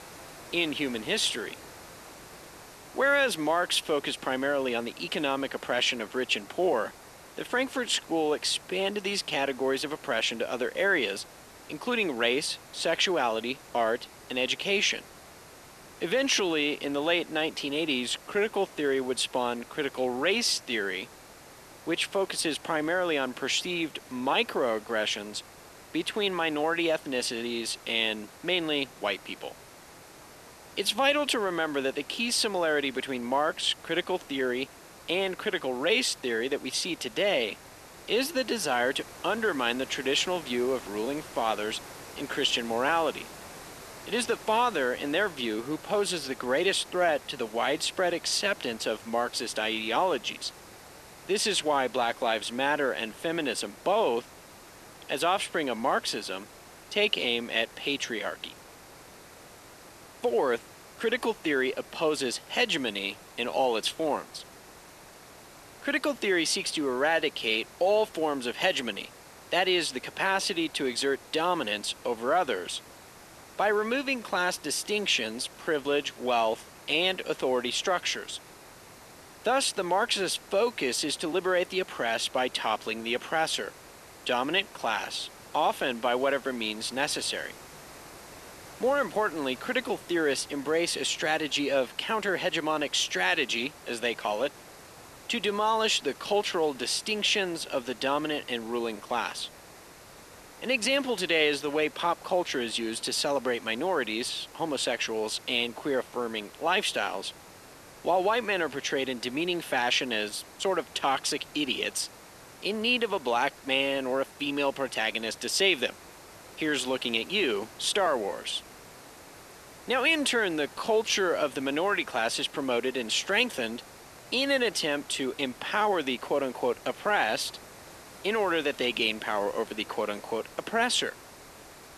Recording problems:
thin; somewhat; fading below 300 Hz
hiss; noticeable; throughout; 20 dB below the speech

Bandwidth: 13.5 kHz